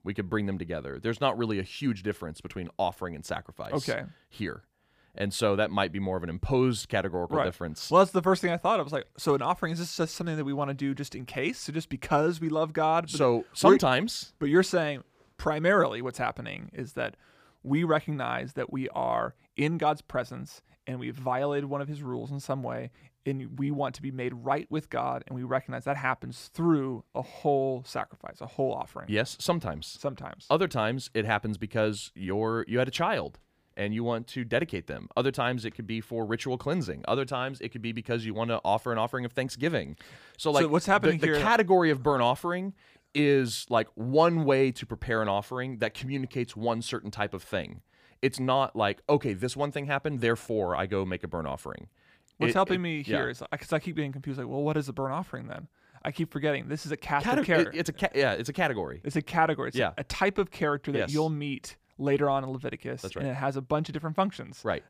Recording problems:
none

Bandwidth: 15 kHz